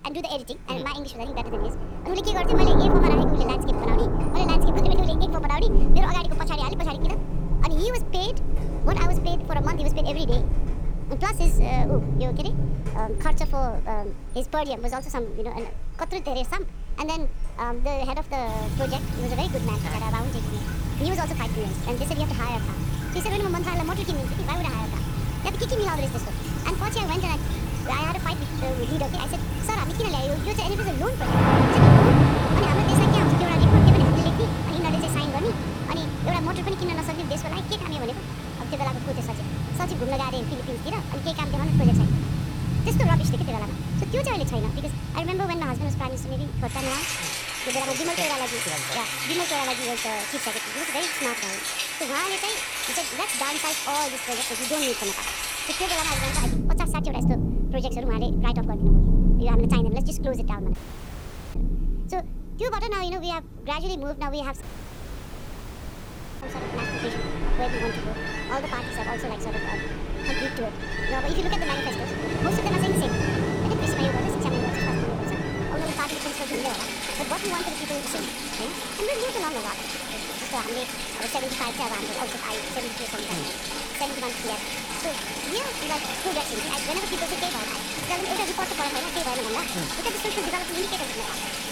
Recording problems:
wrong speed and pitch; too fast and too high; 1.5 times normal speed
rain or running water; very loud; throughout; 5 dB above the speech
audio cutting out; at 1:01 for 1 s and at 1:05 for 2 s

